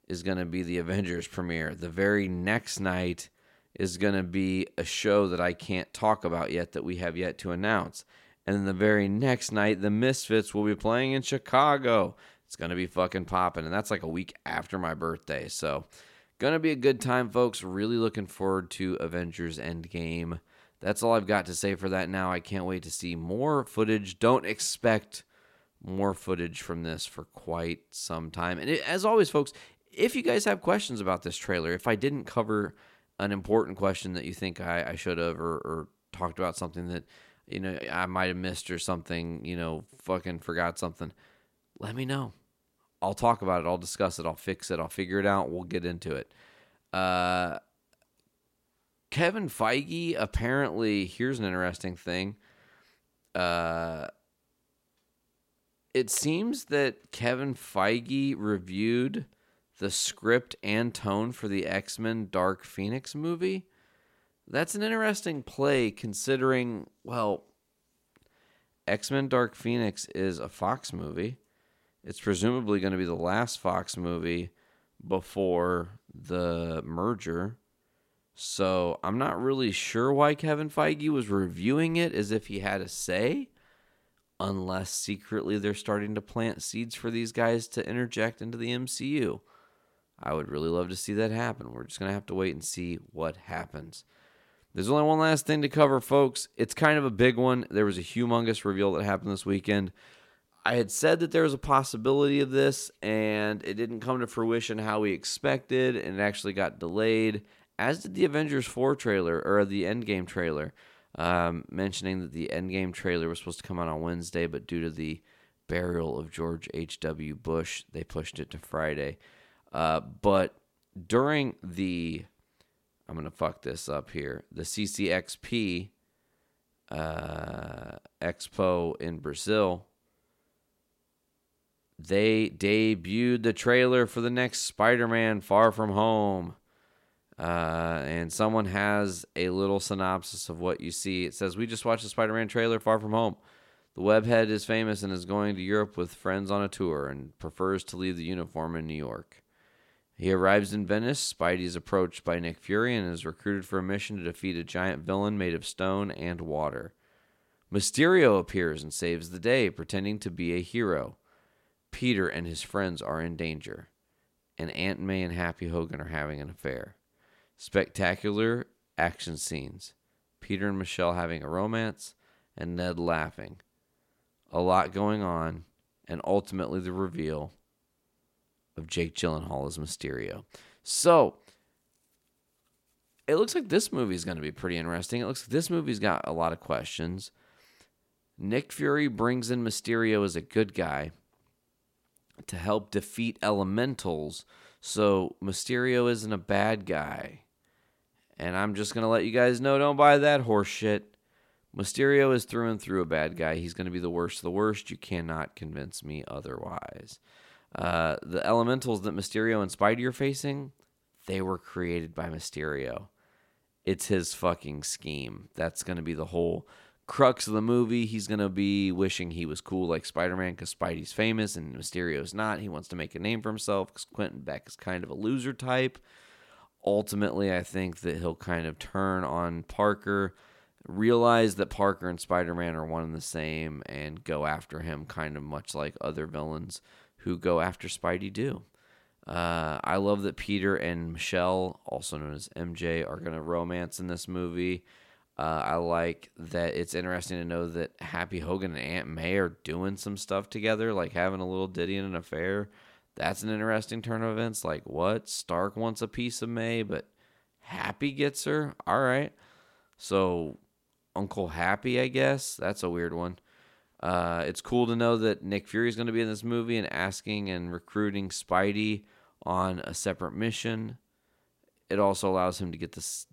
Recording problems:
none

